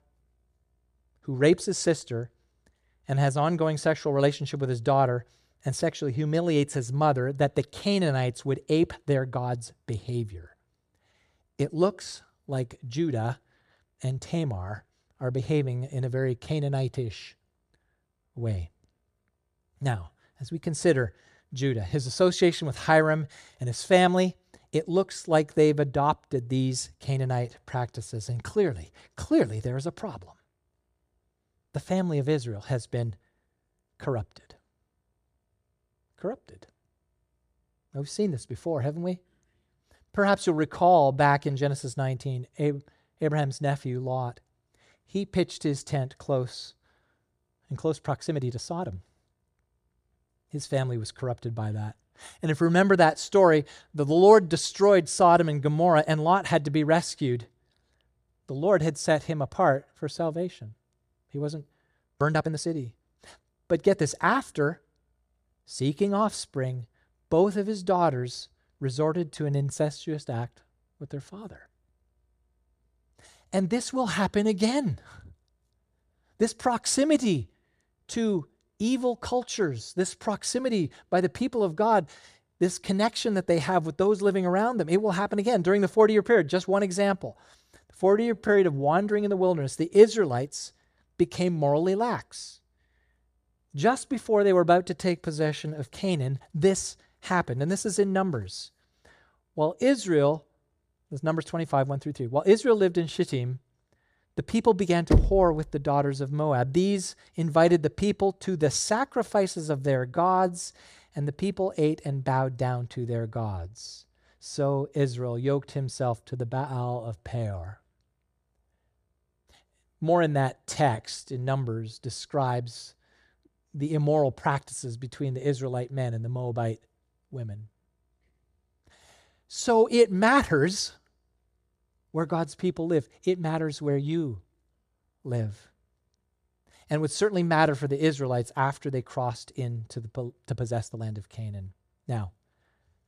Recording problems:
uneven, jittery; strongly; from 27 s to 2:21
door banging; loud; at 1:45; peak 2 dB above the speech

